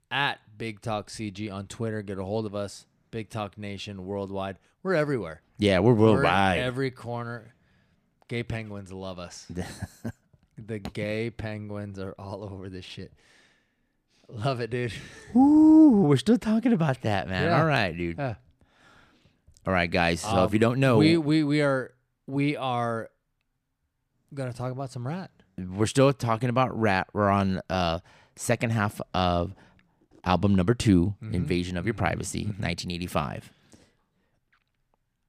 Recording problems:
none

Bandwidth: 14.5 kHz